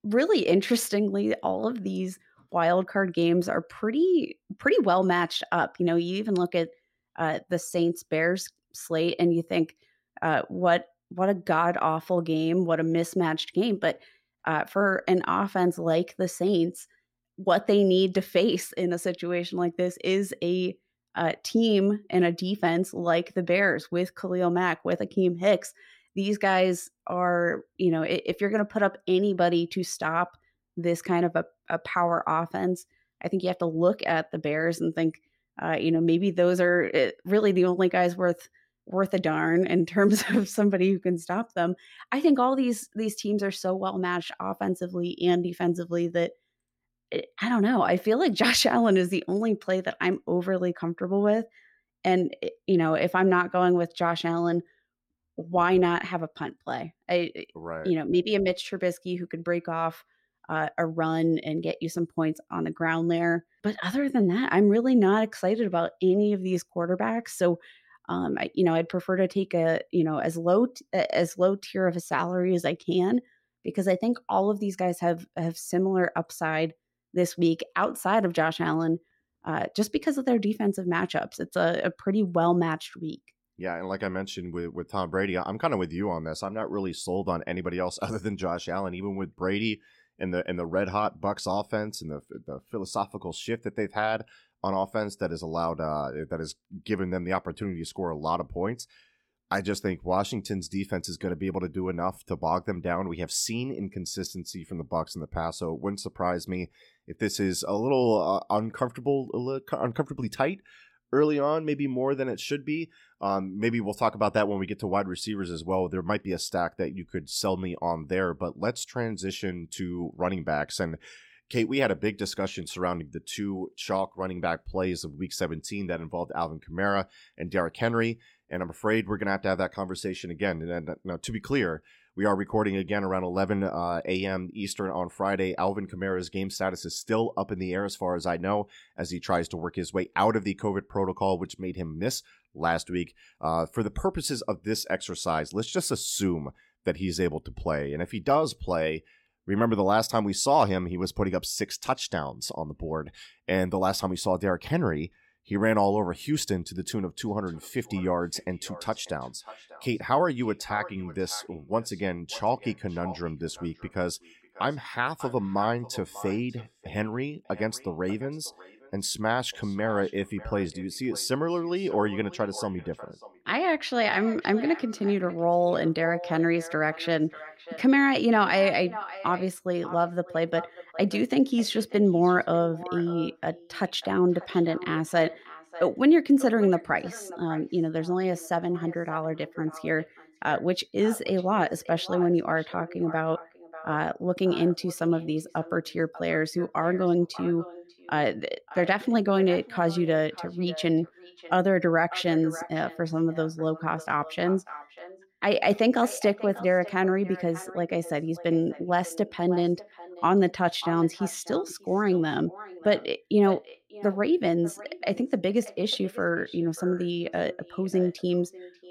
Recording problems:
echo of what is said; noticeable; from 2:37 on; 590 ms later, 15 dB below the speech

